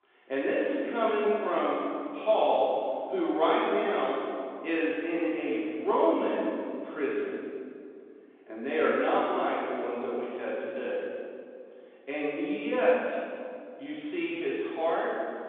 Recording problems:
room echo; strong; dies away in 2 s
off-mic speech; far
phone-call audio; nothing above 3.5 kHz

